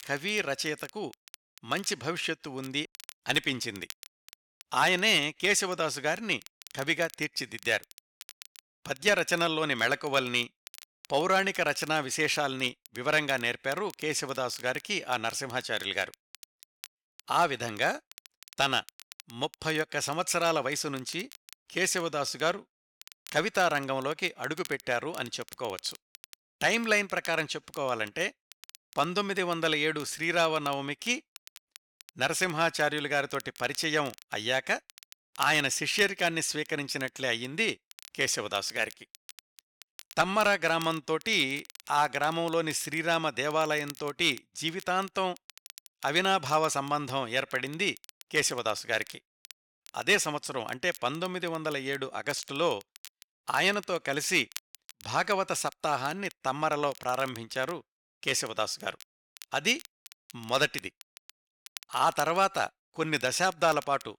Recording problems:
crackle, like an old record; faint; 20 dB below the speech

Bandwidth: 17.5 kHz